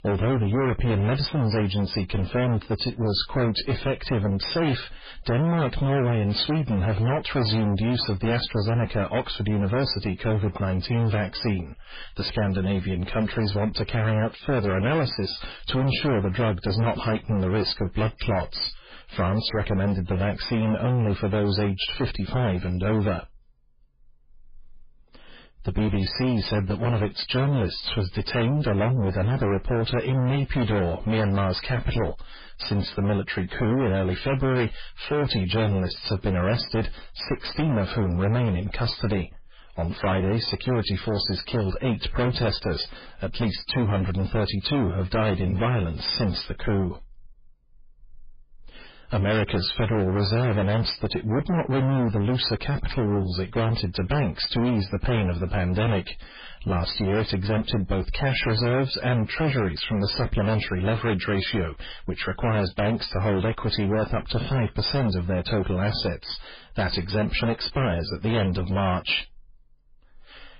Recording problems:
distortion; heavy; 6 dB below the speech
garbled, watery; badly; nothing above 5 kHz

